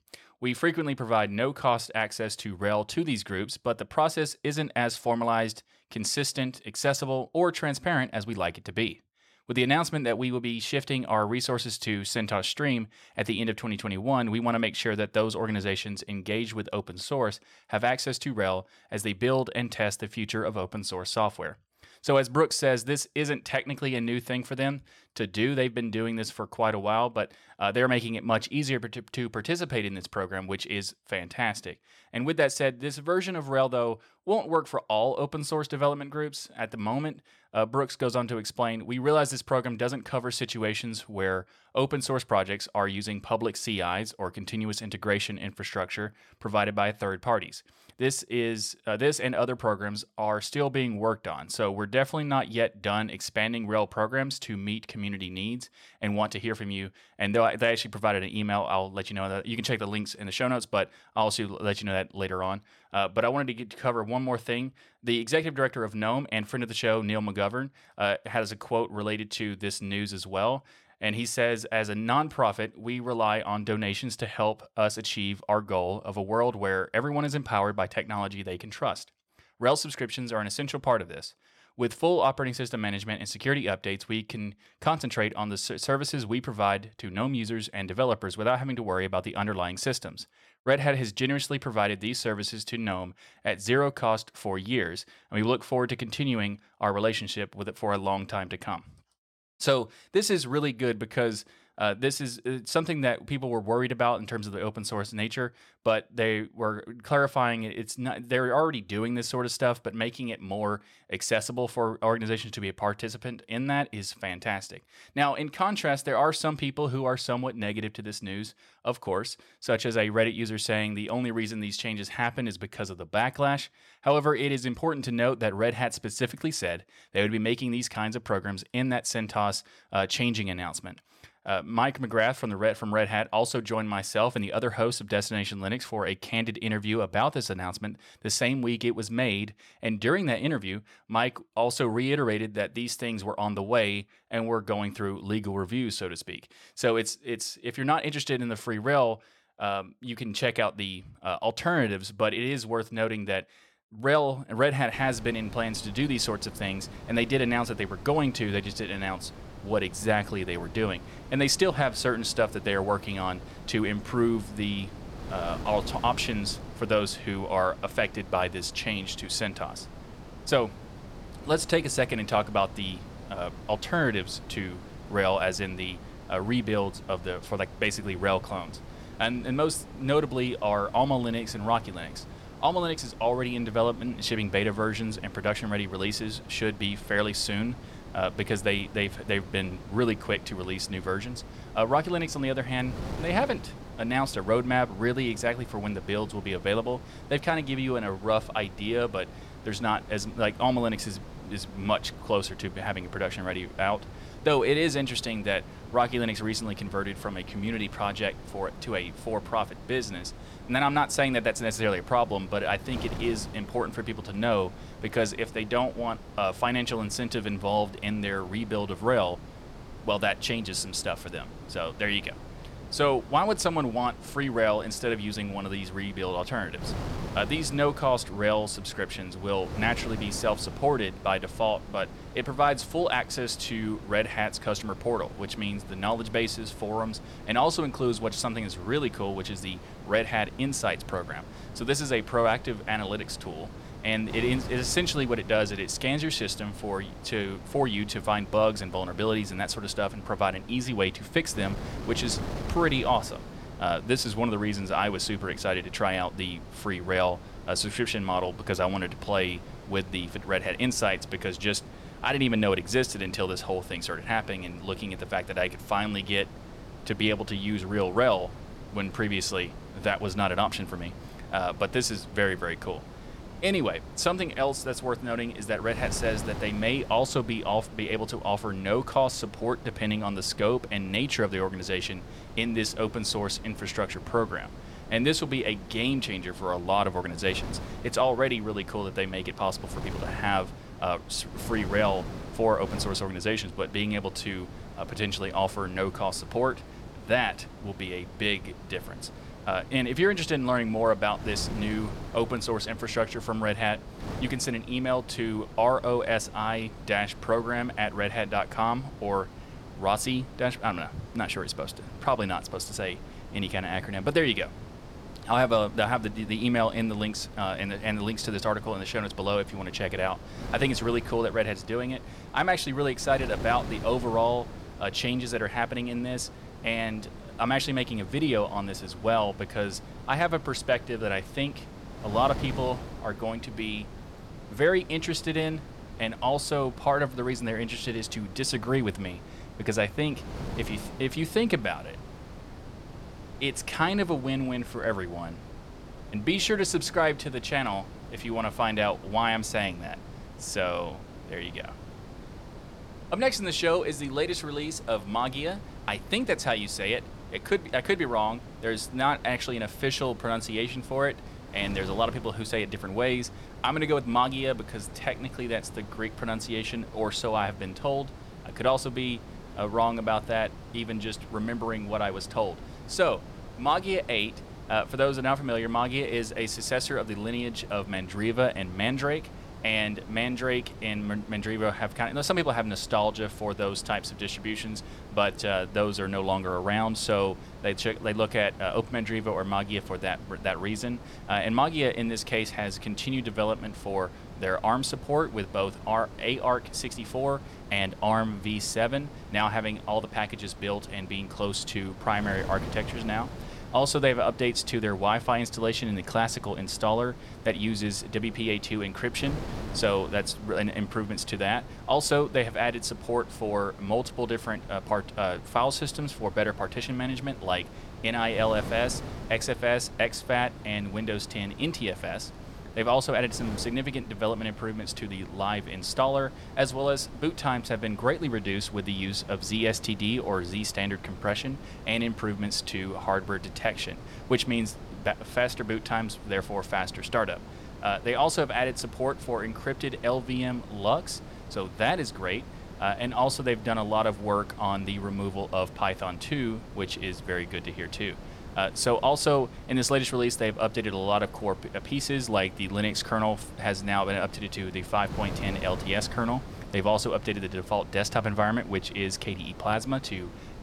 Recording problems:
wind noise on the microphone; occasional gusts; from 2:35 on; 20 dB below the speech

